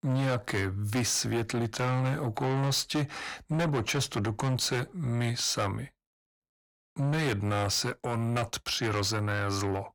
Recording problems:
distortion; heavy; 6 dB below the speech

